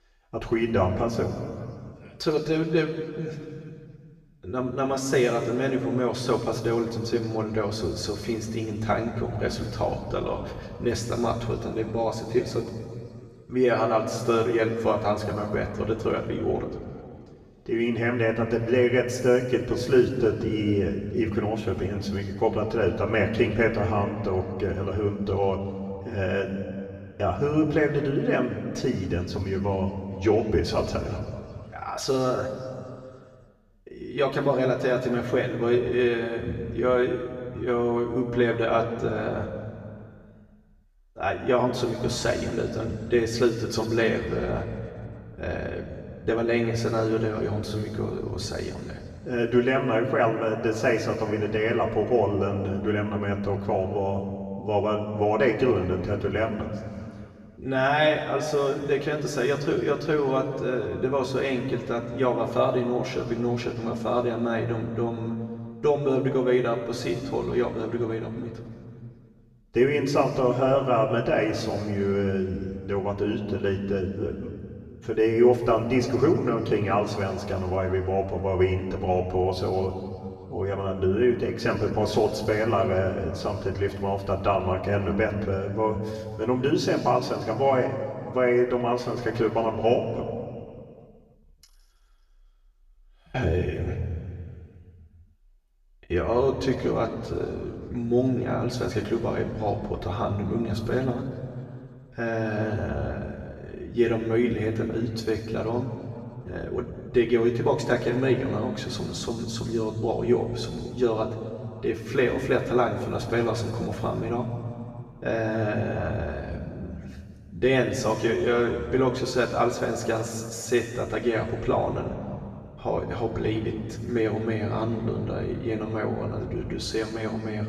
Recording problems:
off-mic speech; far
room echo; noticeable; dies away in 2 s

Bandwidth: 14.5 kHz